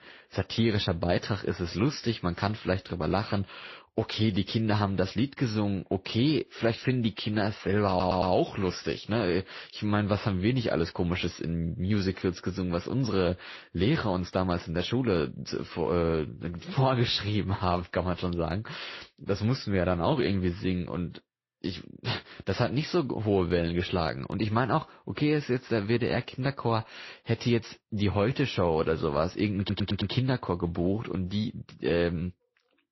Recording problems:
garbled, watery; slightly; nothing above 5.5 kHz
audio stuttering; at 8 s and at 30 s

